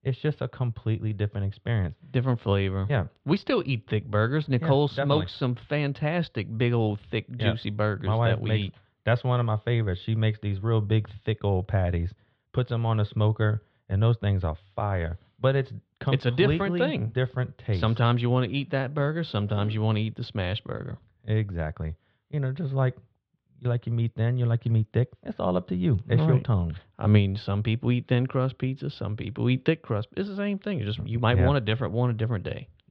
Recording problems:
muffled; slightly; fading above 3.5 kHz

